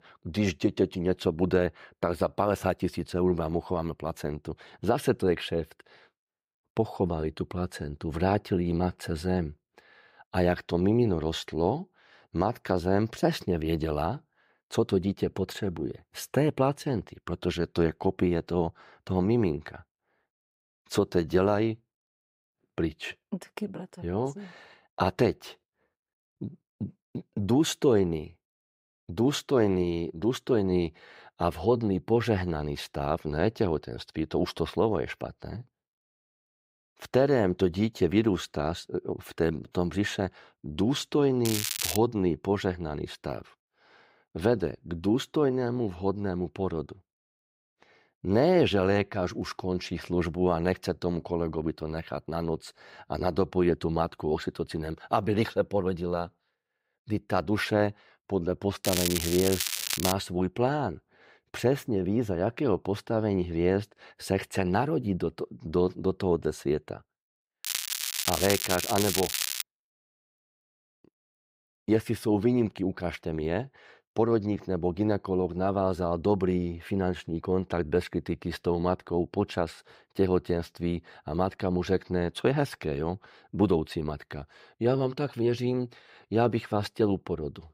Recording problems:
crackling; loud; at 41 s, from 59 s to 1:00 and from 1:08 to 1:10; 1 dB below the speech

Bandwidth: 15.5 kHz